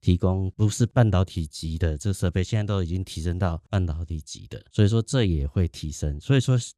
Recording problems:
none

